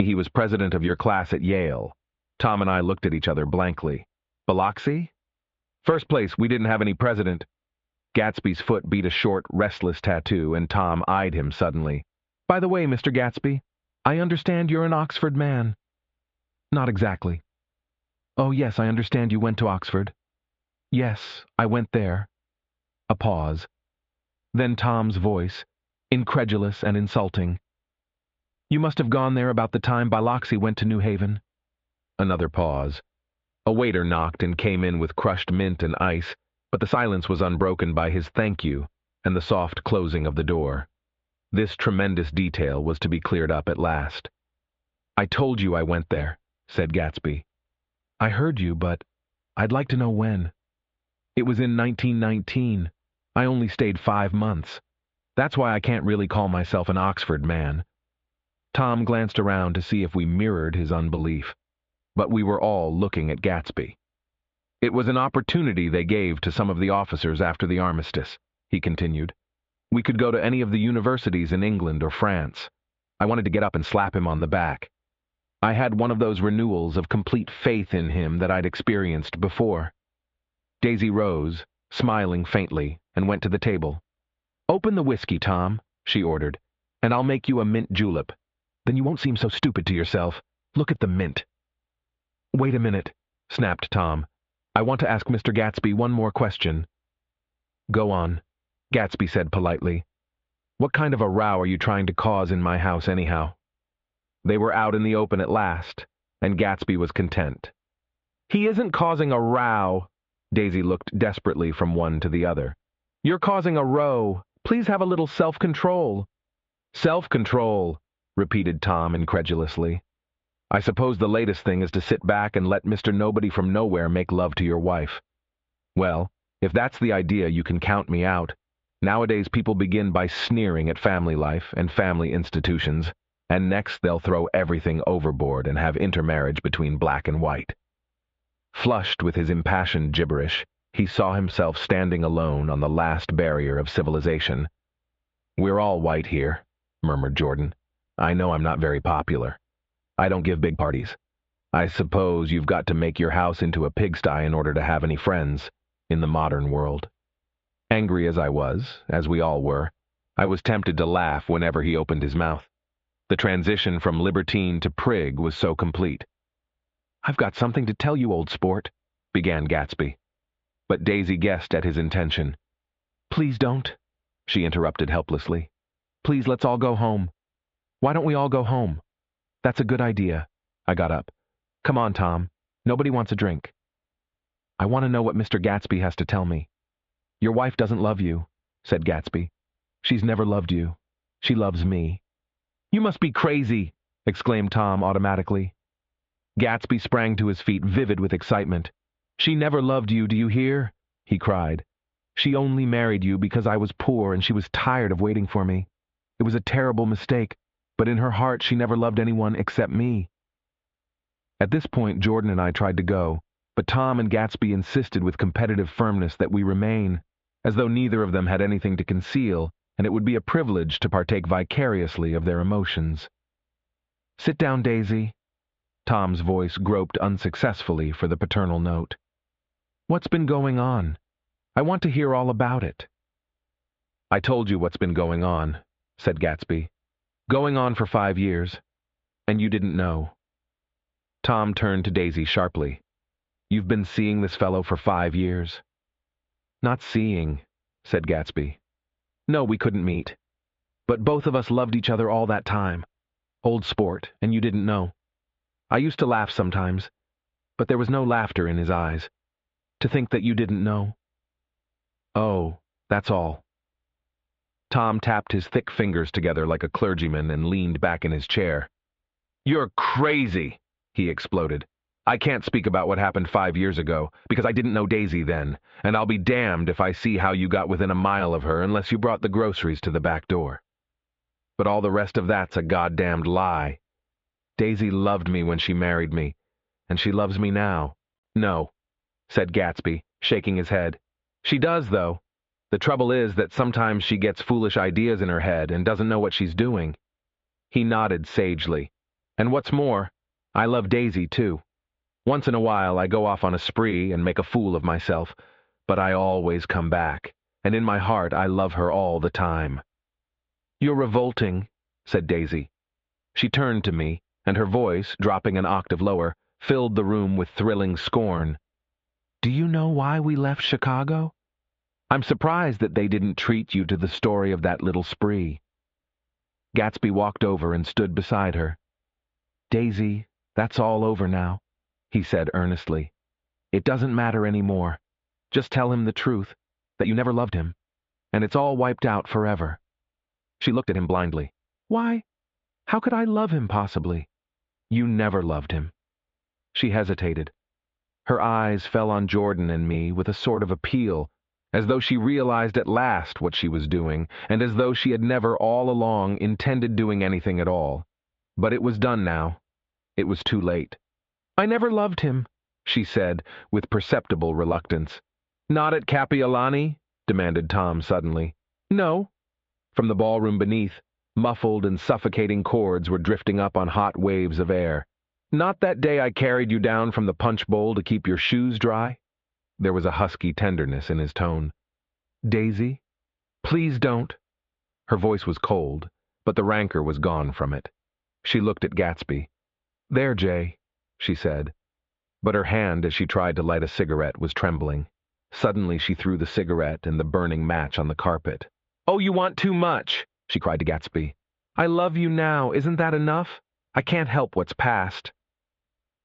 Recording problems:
squashed, flat; heavily
muffled; very slightly; fading above 3.5 kHz
high frequencies cut off; slight; nothing above 8 kHz
abrupt cut into speech; at the start
uneven, jittery; strongly; from 37 s to 6:43

